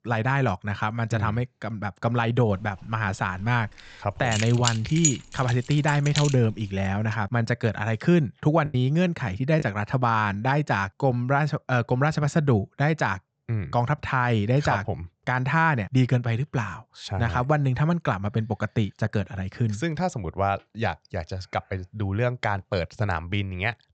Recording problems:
high frequencies cut off; noticeable; nothing above 8 kHz
choppy; occasionally; under 1% of the speech affected
jangling keys; loud; from 4.5 to 6.5 s; peak level with the speech

